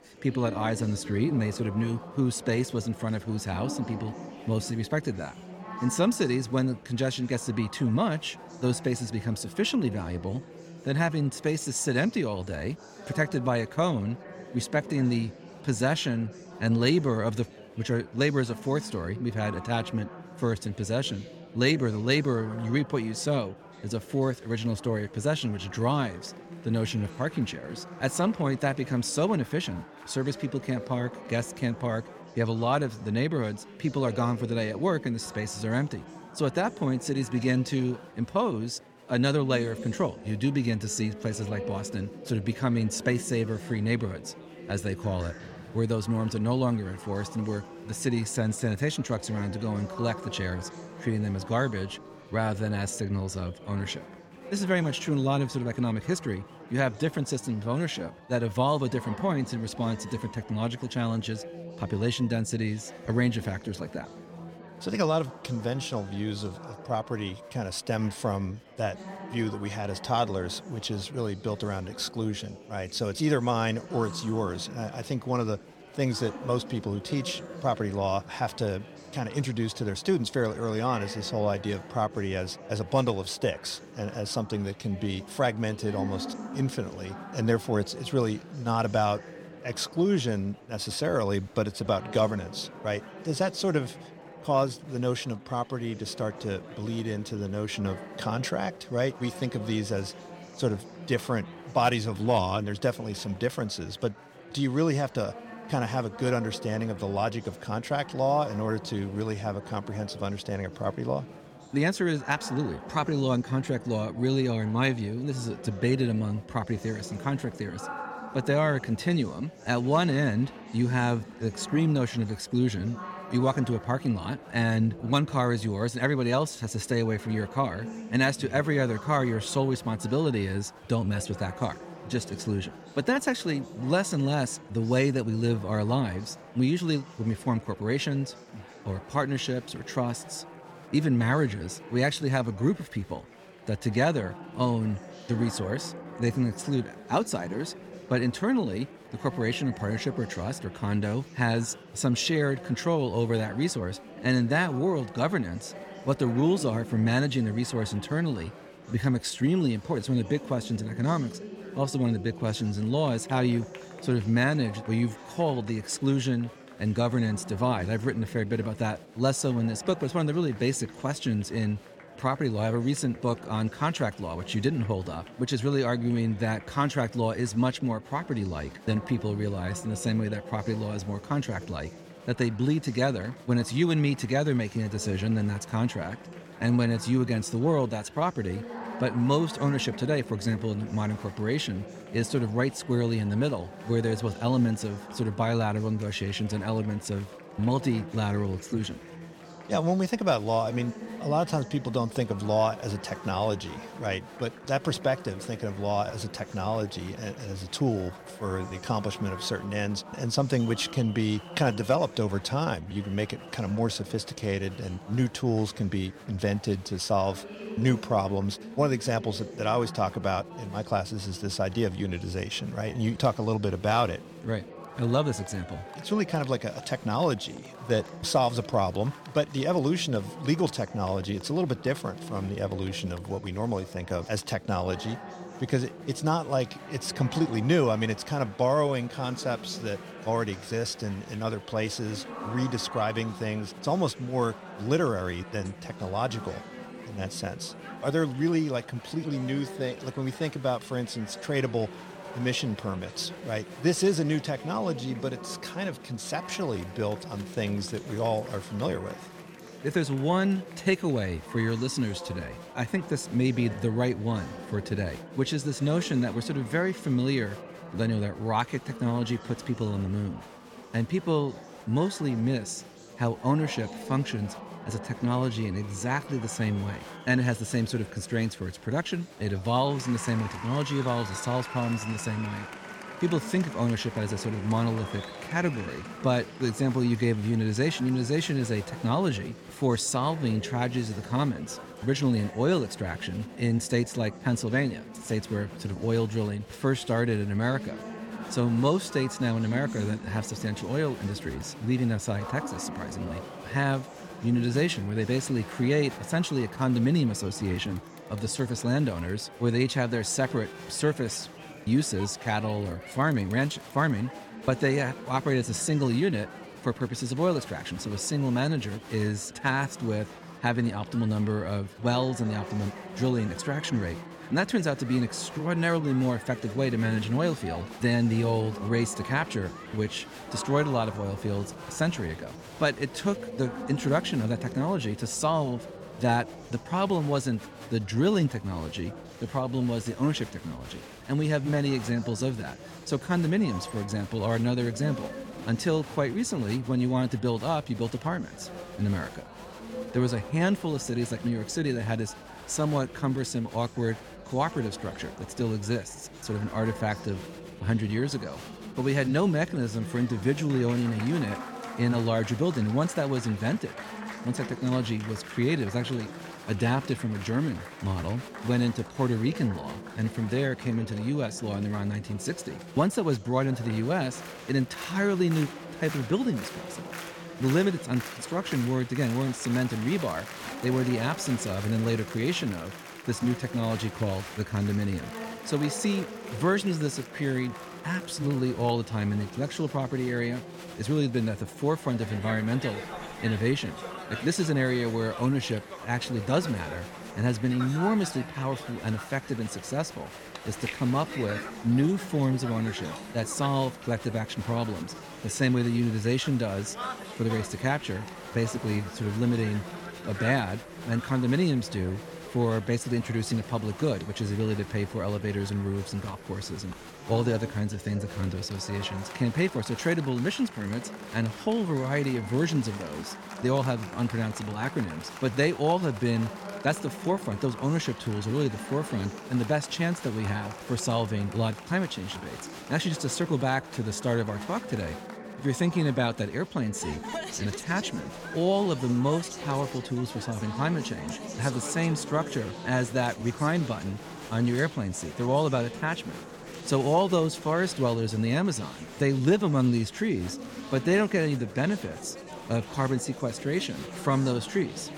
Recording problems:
murmuring crowd; noticeable; throughout; 15 dB below the speech

